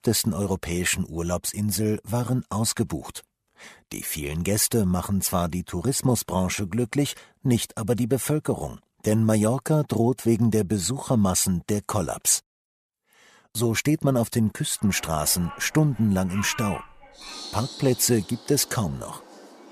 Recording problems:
animal sounds; noticeable; from 15 s on; 15 dB below the speech

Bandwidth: 14.5 kHz